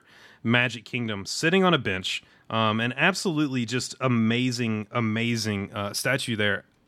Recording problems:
none

